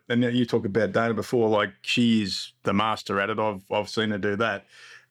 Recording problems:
none

